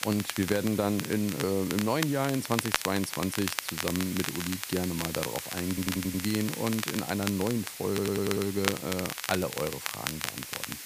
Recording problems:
hiss; loud; throughout; 8 dB below the speech
crackle, like an old record; loud; 5 dB below the speech
audio stuttering; at 5.5 s and at 8 s

